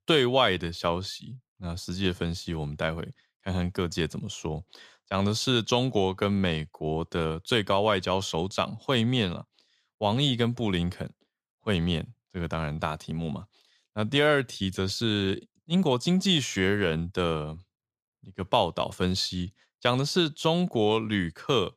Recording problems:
none

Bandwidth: 14.5 kHz